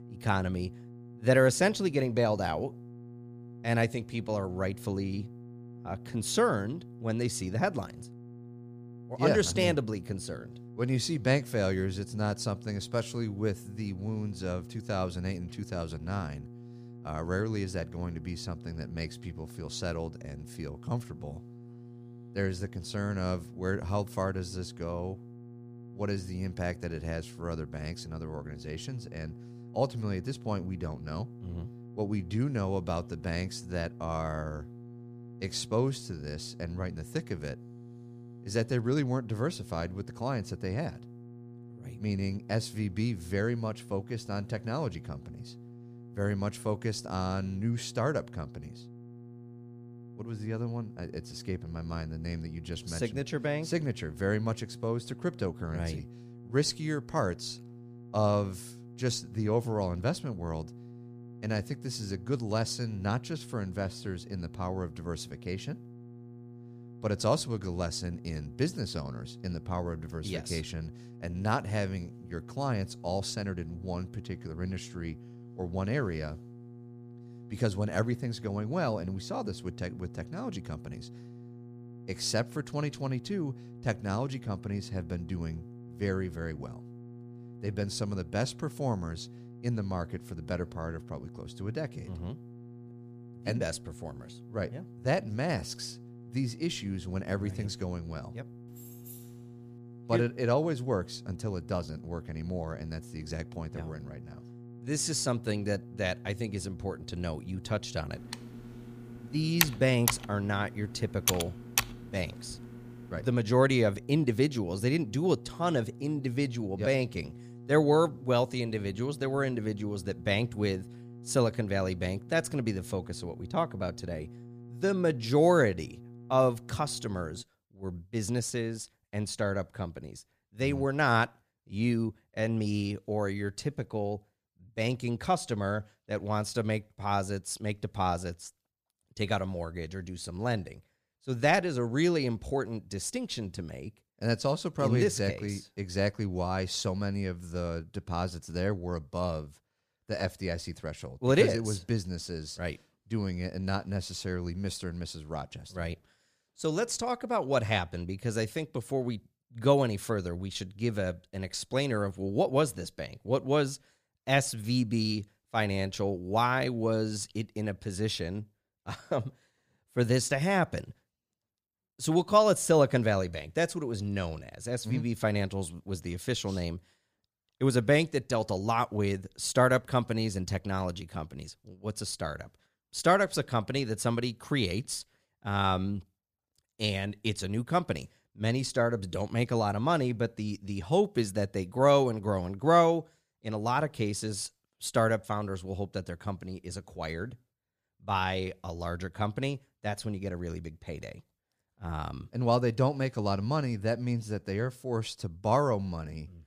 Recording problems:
electrical hum; faint; until 2:07; 60 Hz, 20 dB below the speech
jangling keys; faint; at 1:39; peak 15 dB below the speech
keyboard typing; loud; from 1:48 to 1:52; peak 4 dB above the speech

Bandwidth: 15 kHz